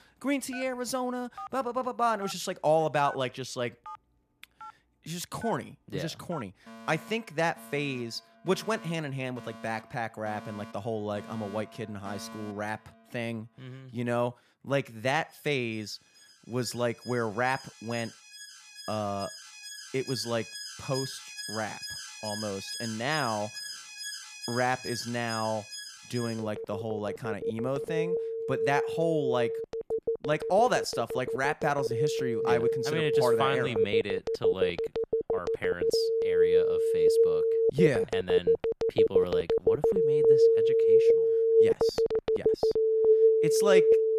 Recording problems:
alarms or sirens; very loud; throughout; 5 dB above the speech

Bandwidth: 14.5 kHz